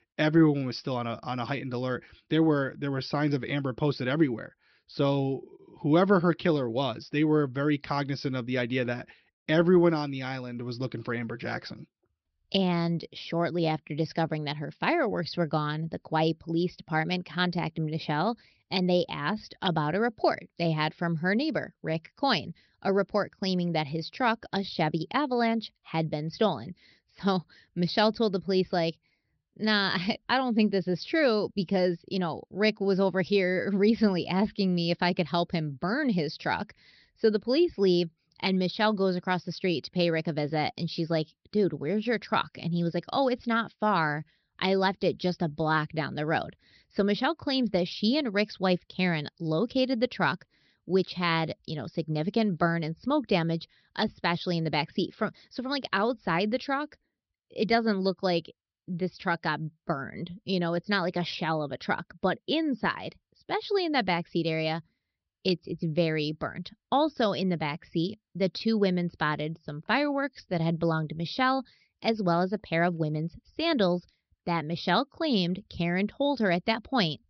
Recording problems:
high frequencies cut off; noticeable; nothing above 5.5 kHz

